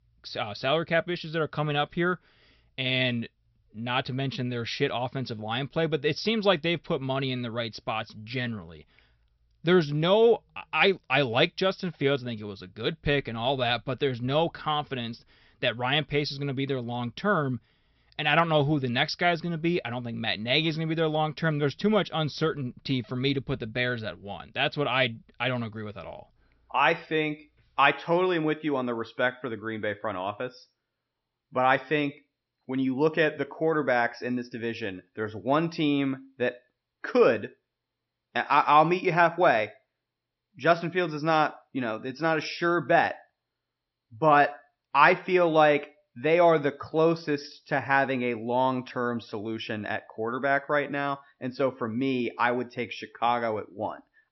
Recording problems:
high frequencies cut off; noticeable; nothing above 5.5 kHz

